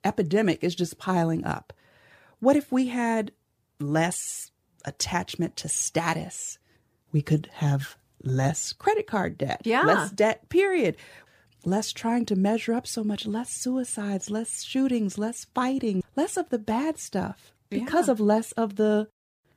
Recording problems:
none

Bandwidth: 15 kHz